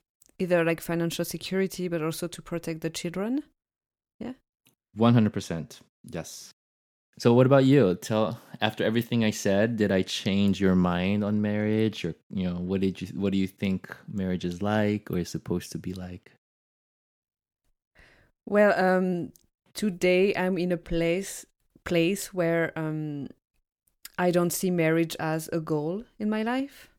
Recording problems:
none

